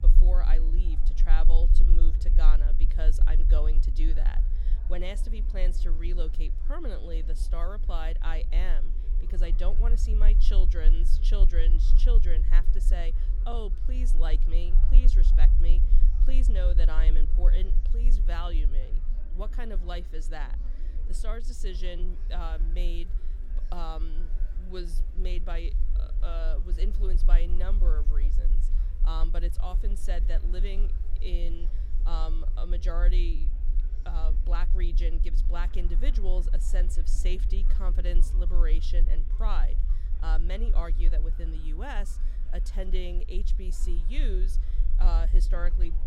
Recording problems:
murmuring crowd; noticeable; throughout; 15 dB below the speech
low rumble; noticeable; throughout; 10 dB below the speech

